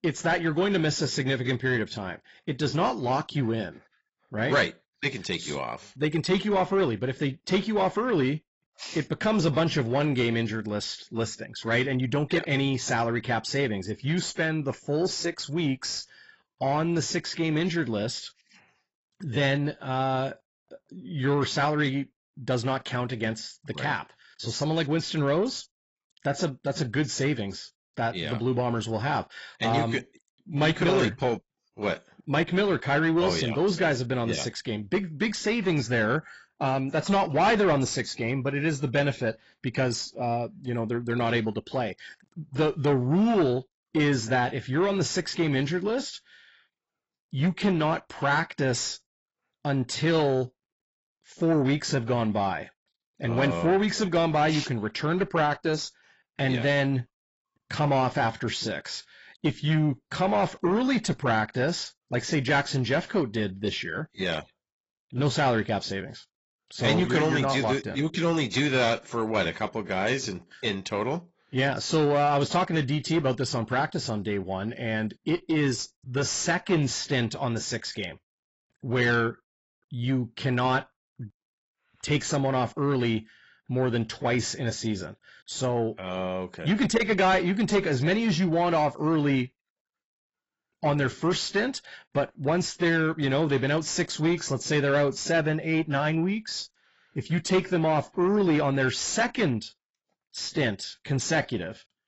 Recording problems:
garbled, watery; badly; nothing above 7.5 kHz
distortion; slight; 10 dB below the speech

